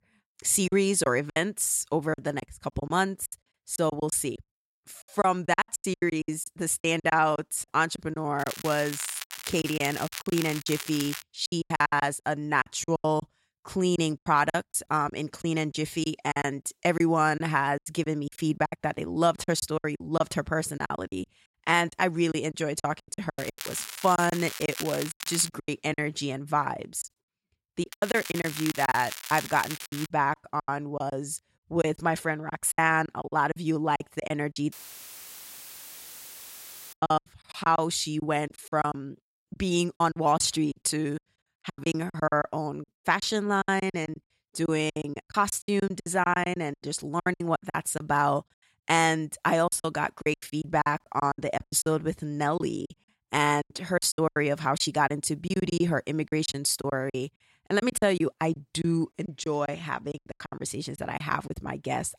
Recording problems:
crackling; loud; from 8.5 to 11 s, from 23 to 25 s and from 28 to 30 s; 9 dB below the speech
choppy; very; 15% of the speech affected
audio cutting out; filled with static; at 35 s for 2 s

